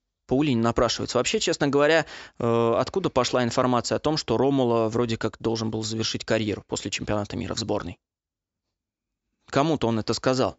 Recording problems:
high frequencies cut off; noticeable; nothing above 8 kHz

